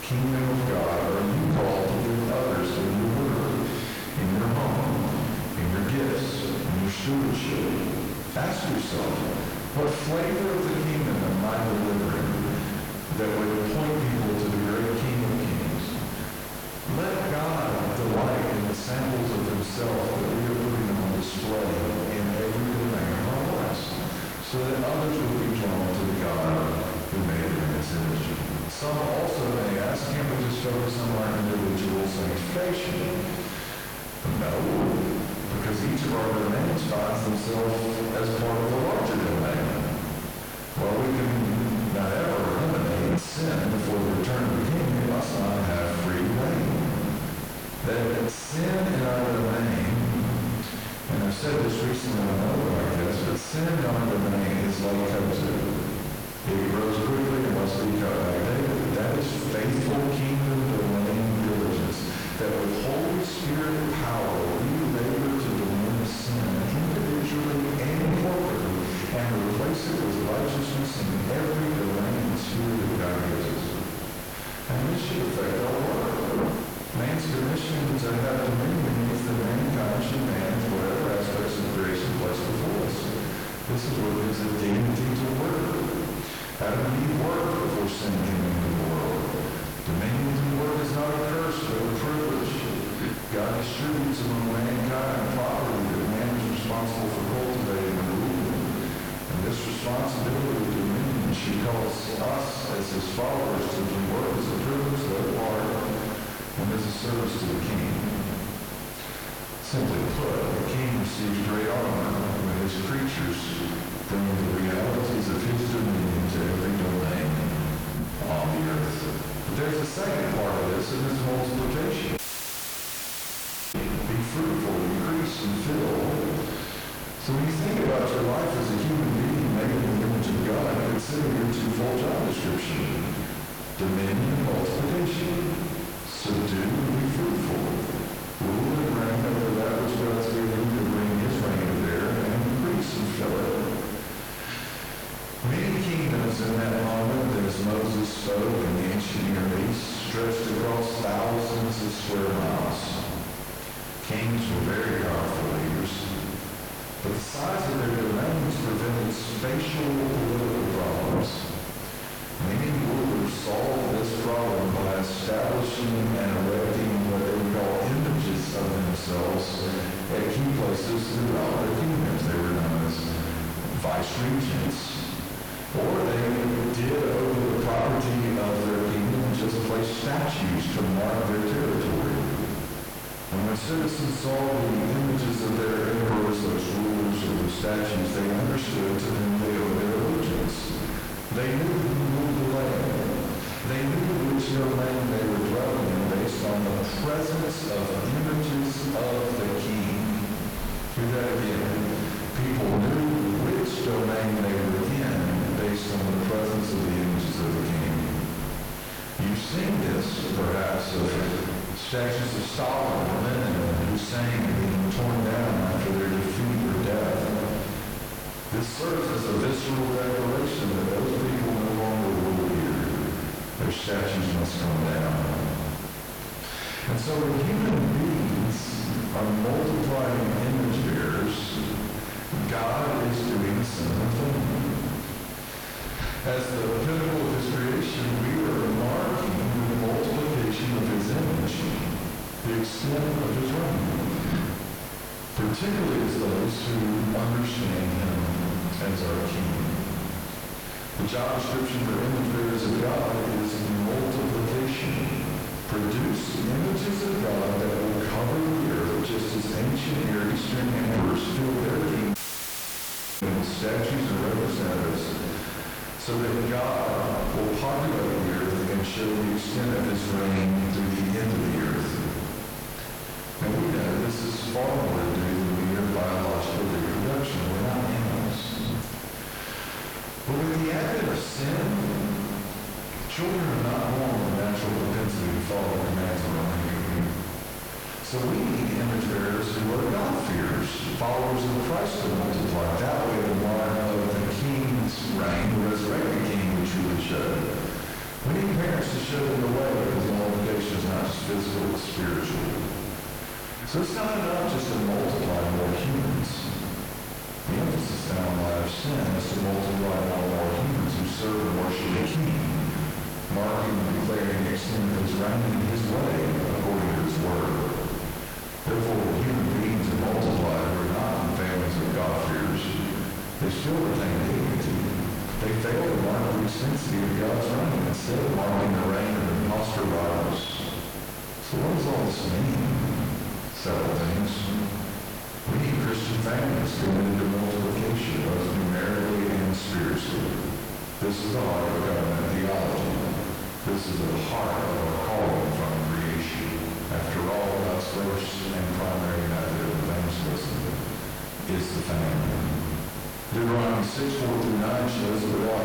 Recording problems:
distortion; heavy; 6 dB below the speech
off-mic speech; far
room echo; noticeable; dies away in 1.1 s
squashed, flat; somewhat
electrical hum; loud; throughout; 60 Hz, 3 dB below the speech
audio cutting out; at 2:02 for 1.5 s and at 4:22 for 1 s

